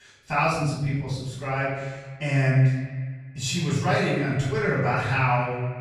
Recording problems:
off-mic speech; far
echo of what is said; noticeable; from 1.5 s on; 130 ms later, 15 dB below the speech
room echo; noticeable; dies away in 1 s

